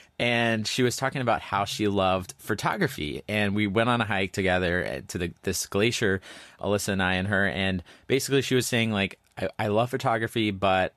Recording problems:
none

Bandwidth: 14 kHz